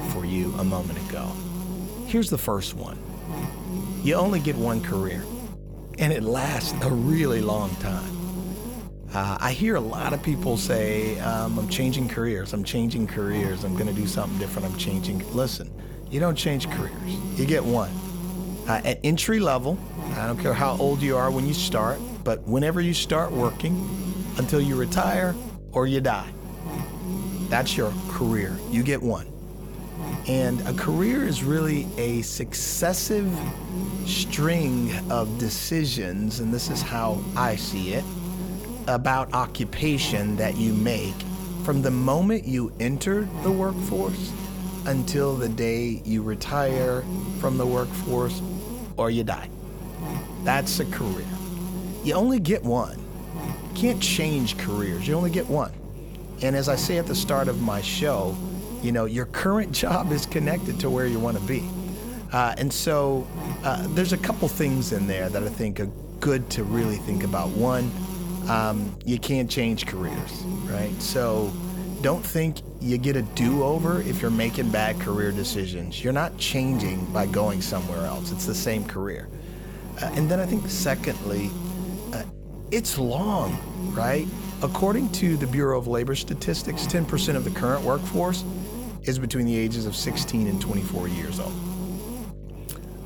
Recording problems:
electrical hum; noticeable; throughout; 50 Hz, 10 dB below the speech

